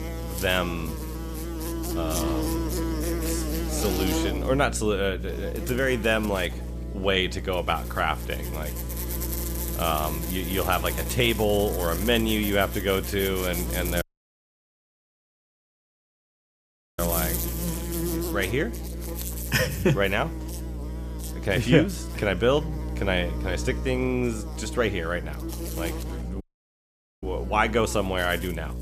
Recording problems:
electrical hum; noticeable; throughout; 60 Hz, 10 dB below the speech
traffic noise; very faint; throughout; 20 dB below the speech
audio cutting out; at 14 s for 3 s and at 26 s for 1 s

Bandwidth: 14.5 kHz